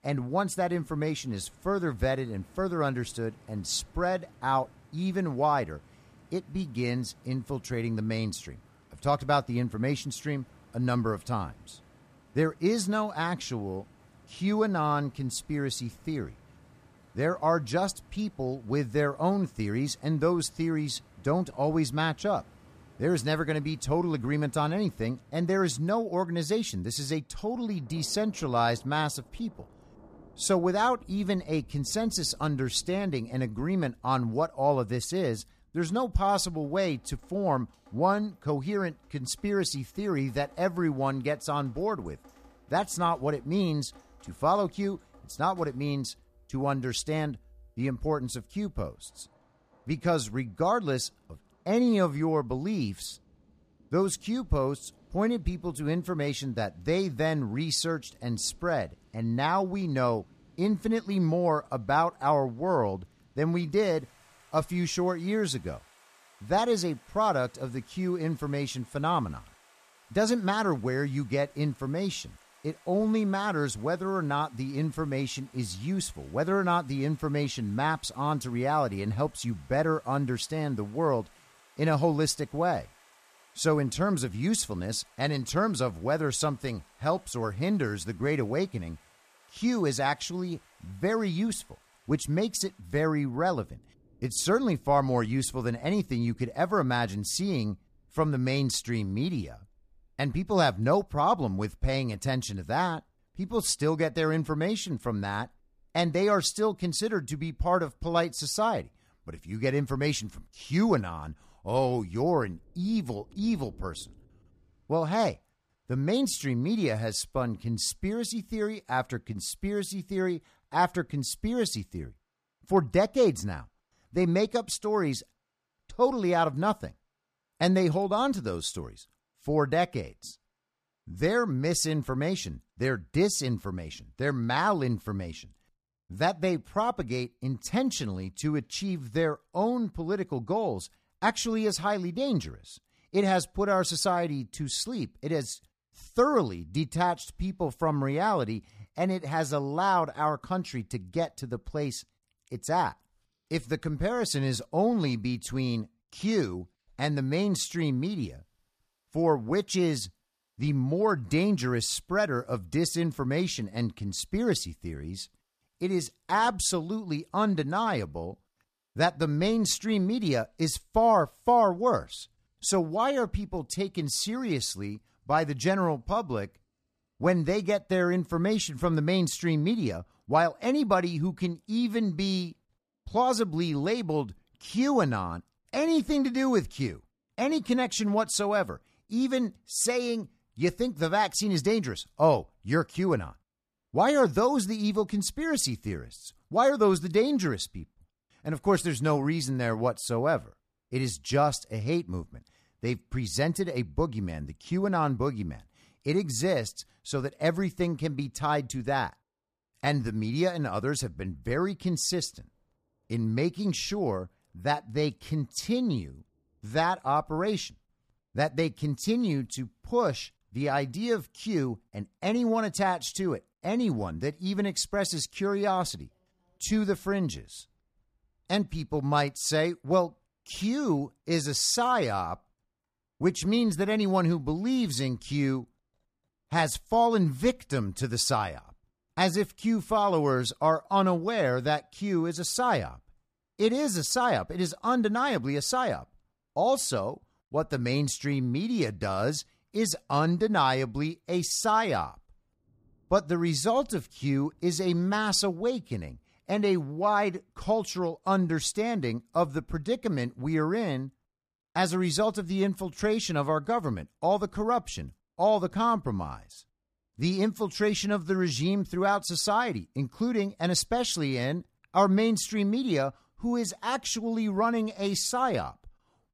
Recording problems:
rain or running water; faint; throughout; 30 dB below the speech

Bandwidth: 14.5 kHz